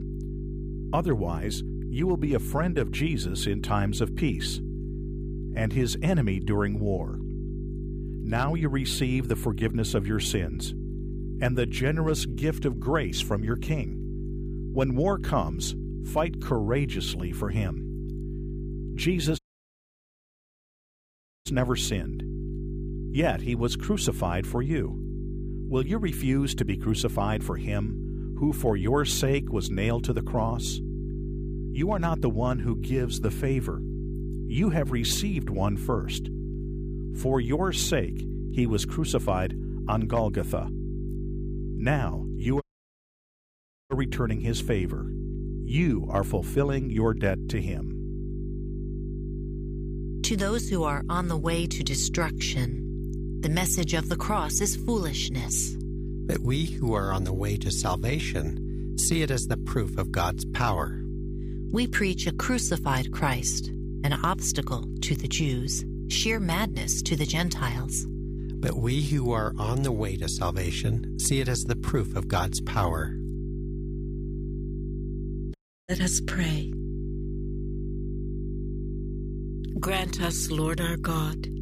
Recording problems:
electrical hum; noticeable; throughout; 50 Hz, 10 dB below the speech
audio cutting out; at 19 s for 2 s, at 43 s for 1.5 s and at 1:16

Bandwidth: 15 kHz